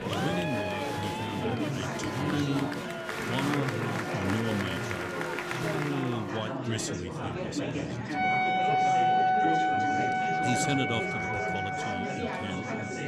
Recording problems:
background music; very loud; throughout; 5 dB above the speech
murmuring crowd; very loud; throughout; 2 dB above the speech

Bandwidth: 15 kHz